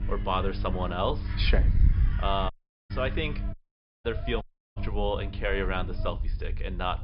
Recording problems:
high frequencies cut off; noticeable; nothing above 5.5 kHz
electrical hum; noticeable; until 1.5 s, from 2.5 to 3.5 s and from 5 to 6 s; 50 Hz, 20 dB below the speech
animal sounds; noticeable; throughout; 15 dB below the speech
wind noise on the microphone; occasional gusts; 20 dB below the speech
audio cutting out; at 2.5 s, at 3.5 s for 0.5 s and at 4.5 s

